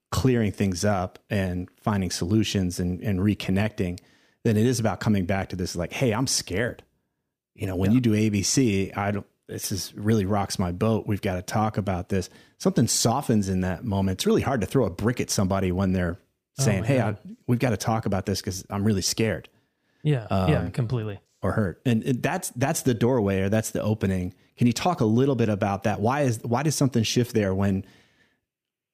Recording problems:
none

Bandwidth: 15 kHz